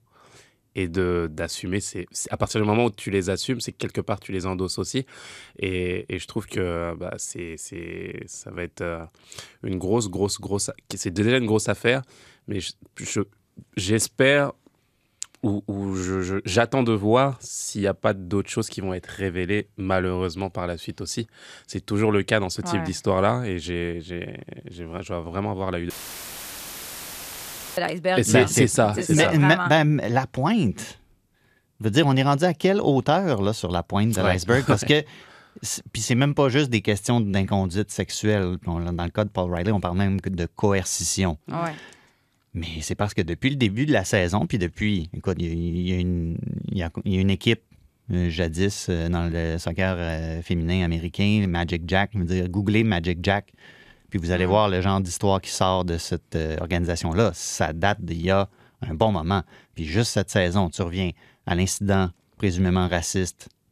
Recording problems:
audio cutting out; filled with static; at 26 s for 2 s

